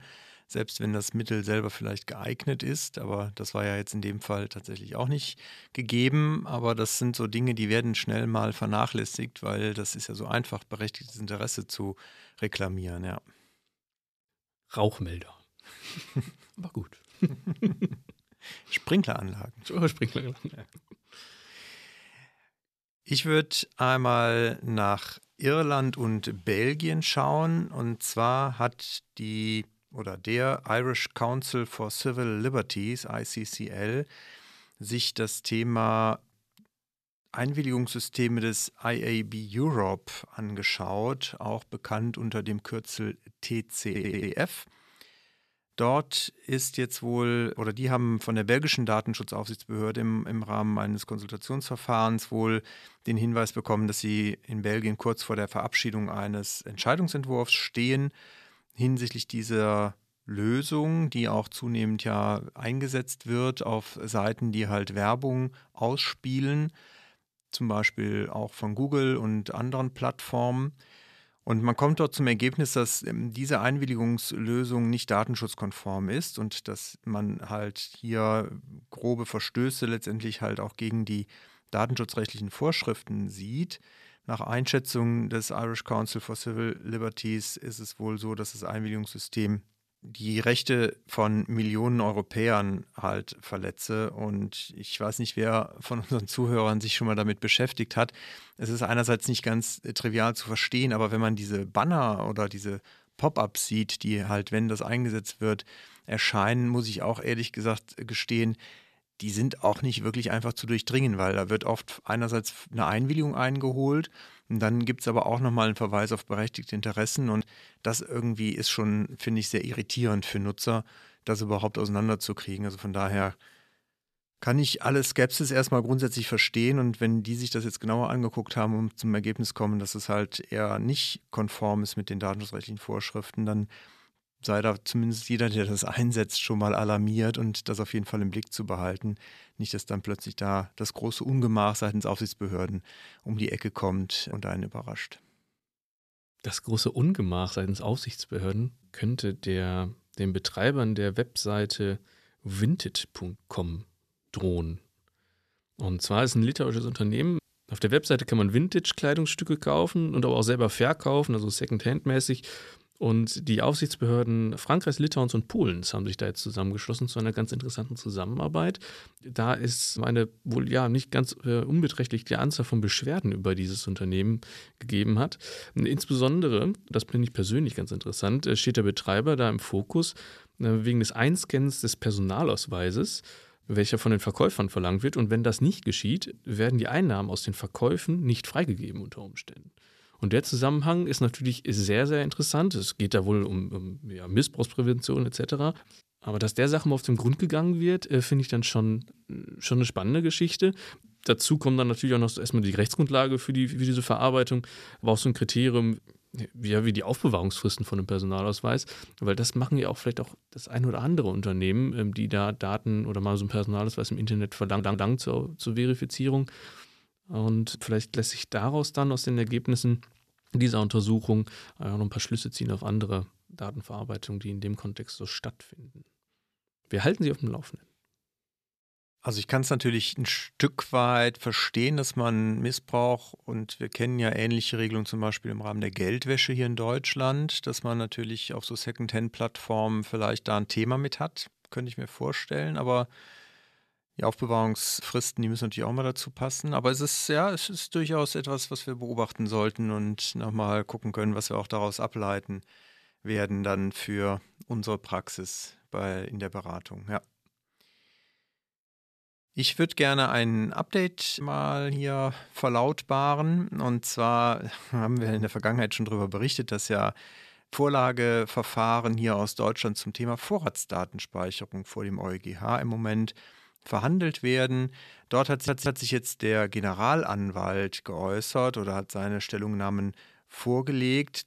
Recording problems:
audio stuttering; at 44 s, at 3:35 and at 4:36

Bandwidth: 14 kHz